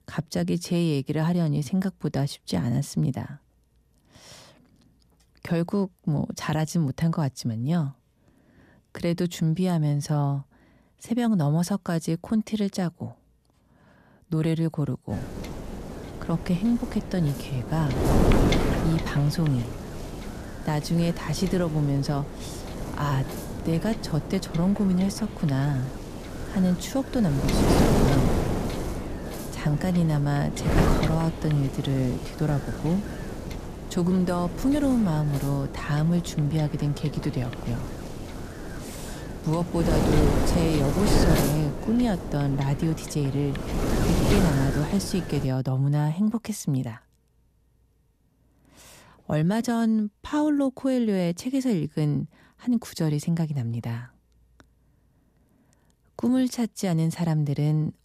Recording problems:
wind noise on the microphone; heavy; from 15 to 45 s; 2 dB below the speech

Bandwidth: 14.5 kHz